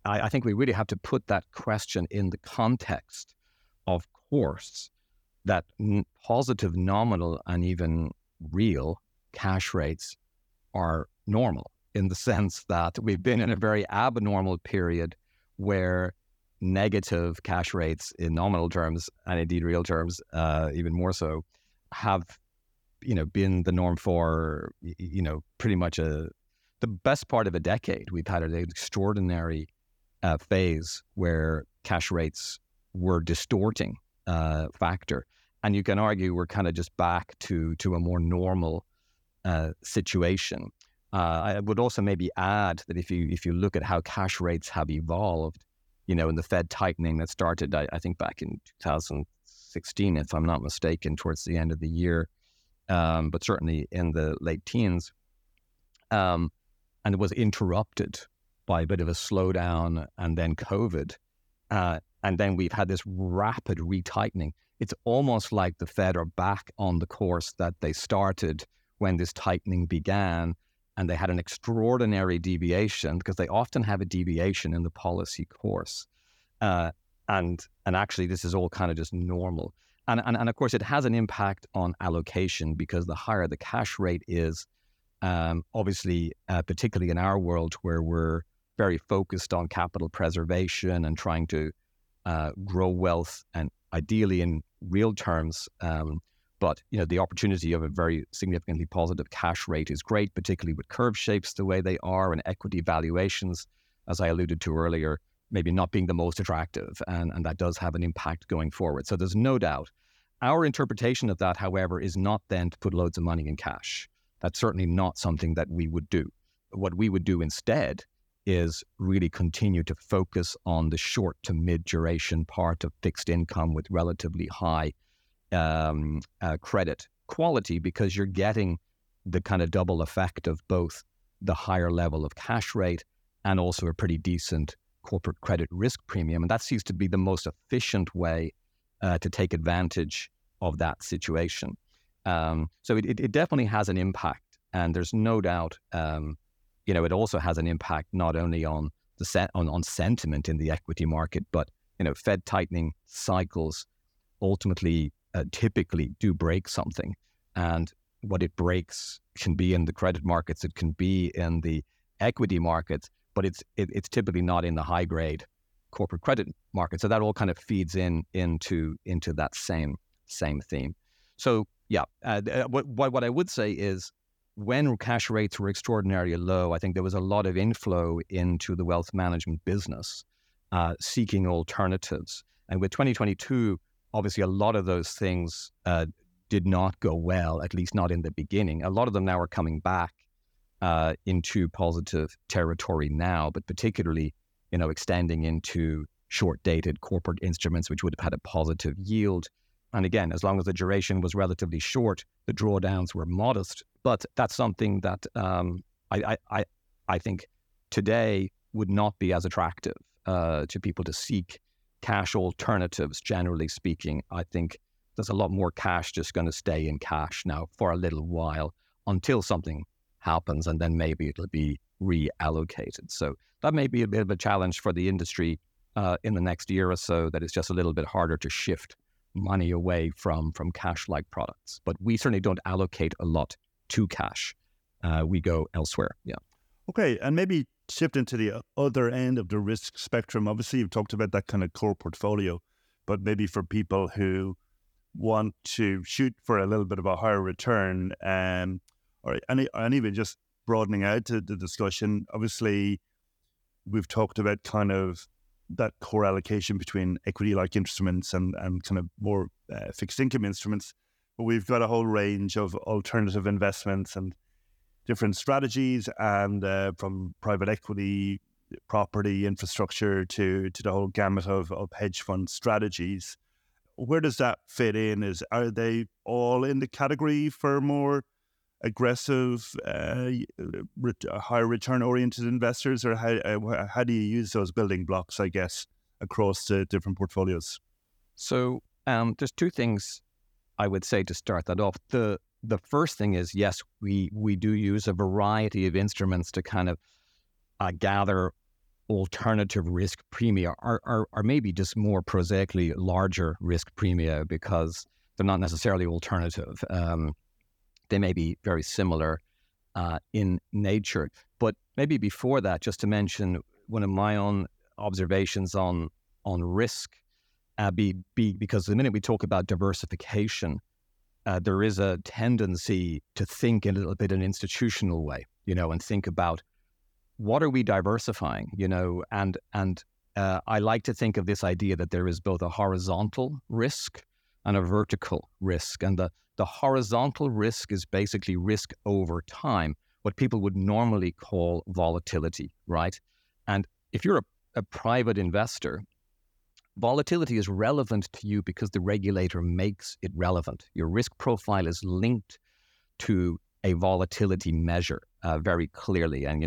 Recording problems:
abrupt cut into speech; at the end

